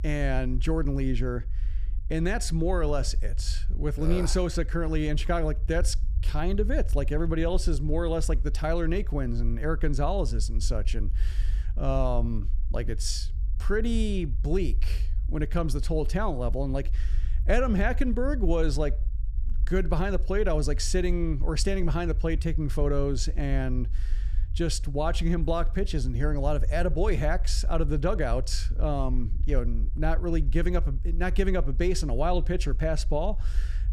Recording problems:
low rumble; faint; throughout; 20 dB below the speech

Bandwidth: 15 kHz